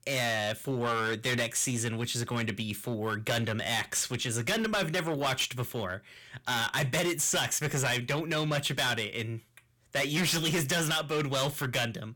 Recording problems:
distortion; heavy; 14% of the sound clipped

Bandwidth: 18.5 kHz